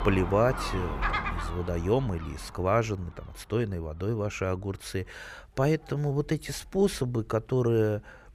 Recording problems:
animal sounds; loud; throughout; 6 dB below the speech

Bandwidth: 14.5 kHz